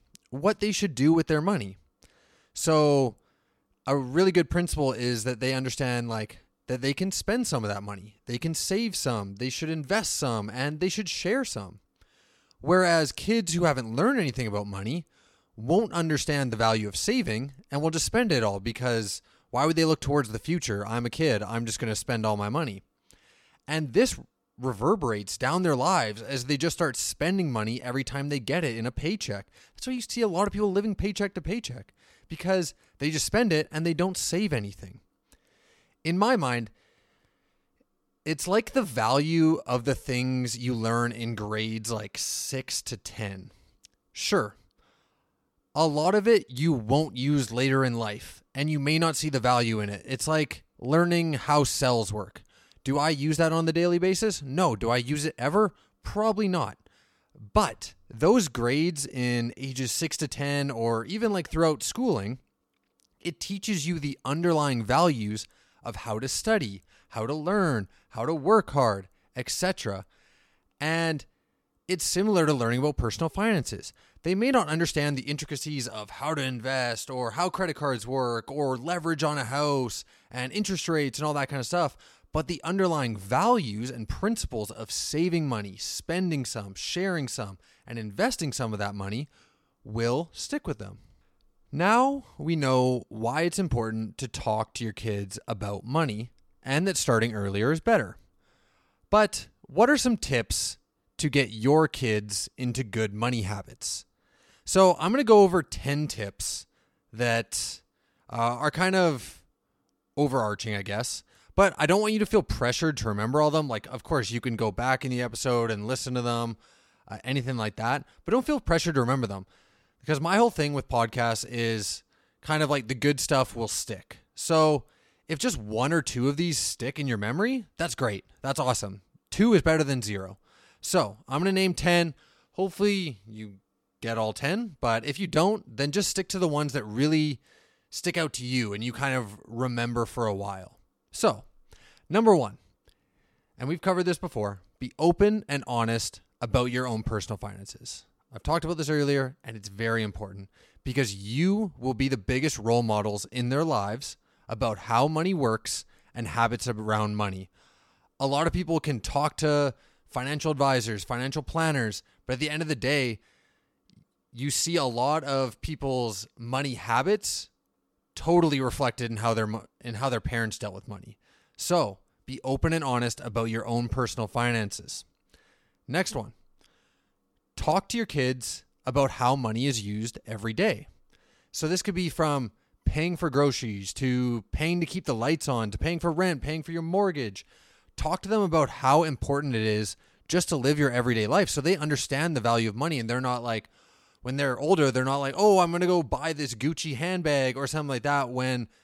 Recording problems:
none

